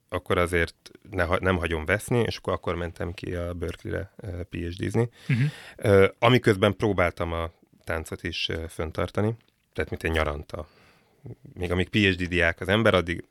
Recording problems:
none

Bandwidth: 18.5 kHz